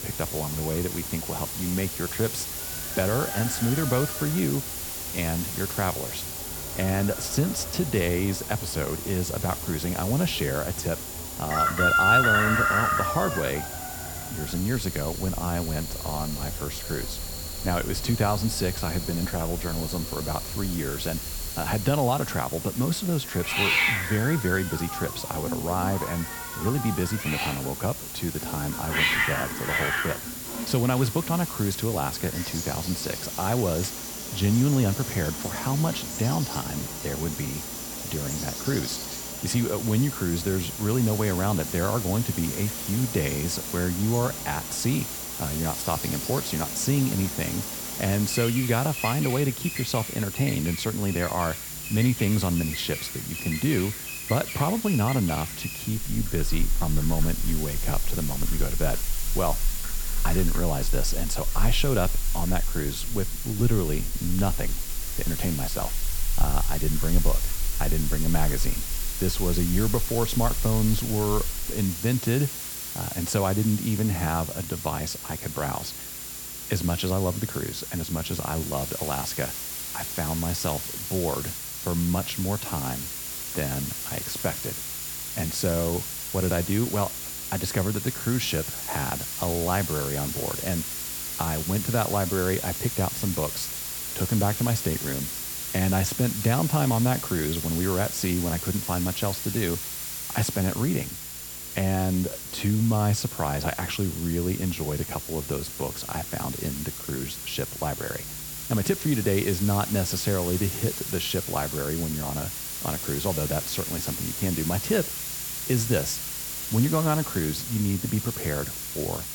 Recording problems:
animal sounds; loud; until 1:12; 5 dB below the speech
hiss; loud; throughout; 4 dB below the speech
high-pitched whine; noticeable; throughout; 7 kHz, 15 dB below the speech
electrical hum; faint; throughout; 60 Hz, 25 dB below the speech

